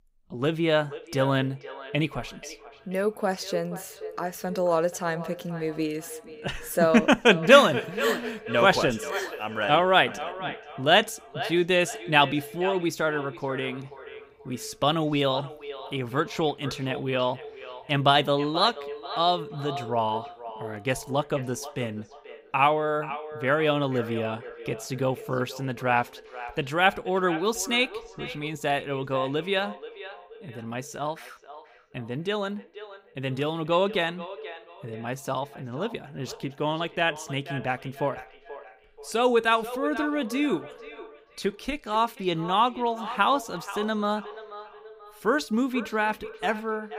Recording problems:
echo of what is said; noticeable; throughout; 480 ms later, 15 dB below the speech

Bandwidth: 15.5 kHz